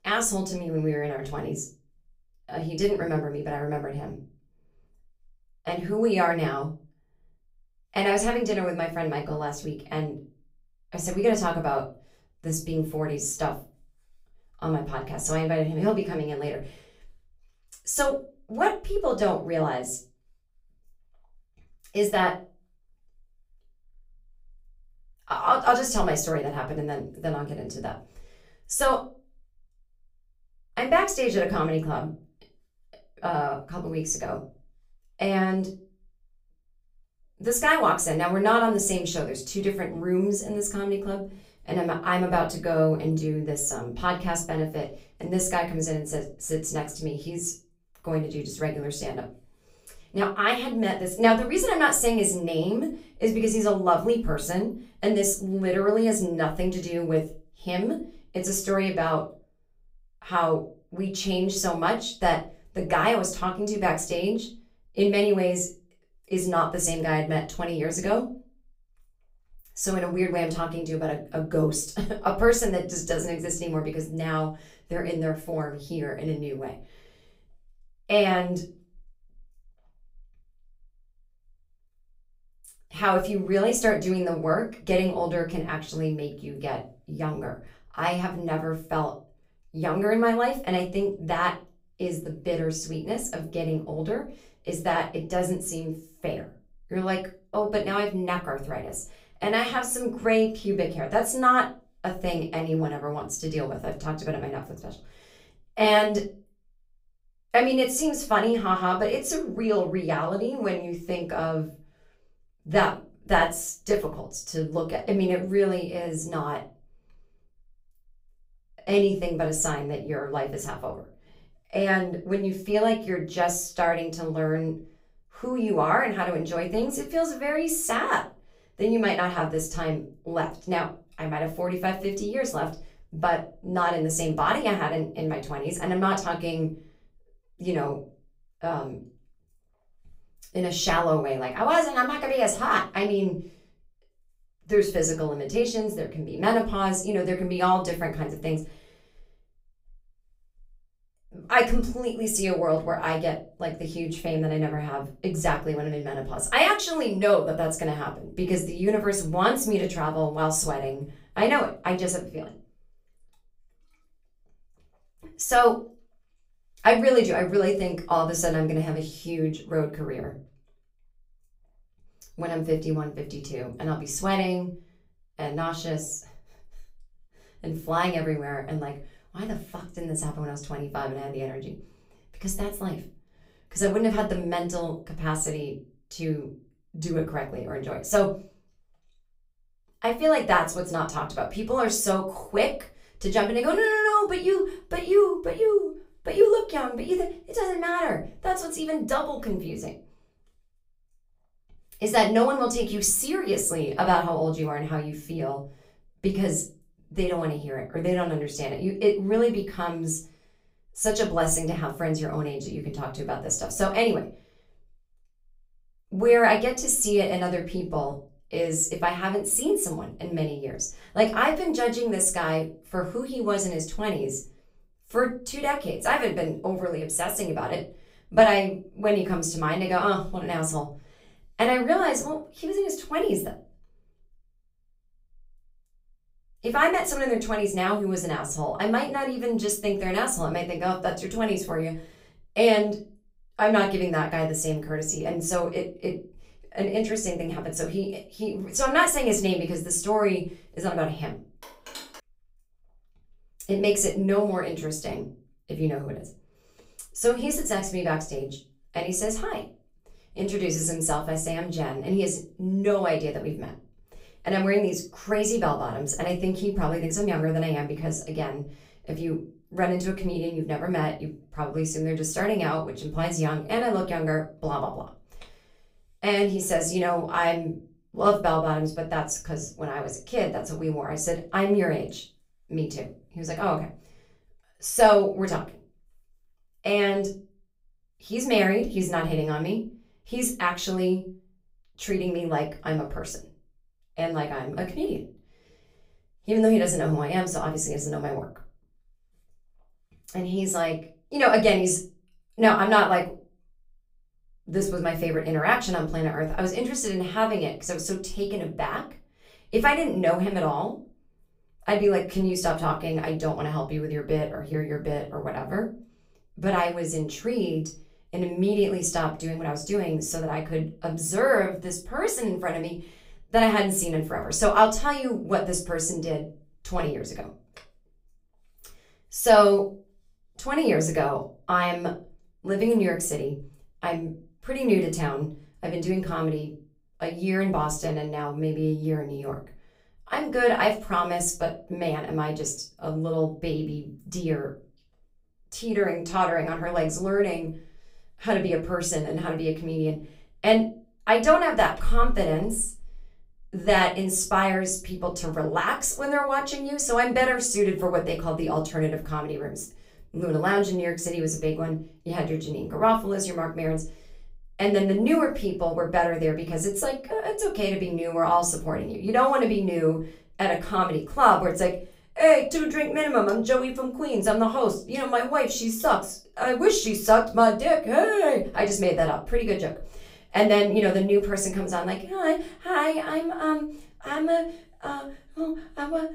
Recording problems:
off-mic speech; far
room echo; very slight; dies away in 0.3 s
phone ringing; faint; at 4:12; peak 15 dB below the speech

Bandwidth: 15.5 kHz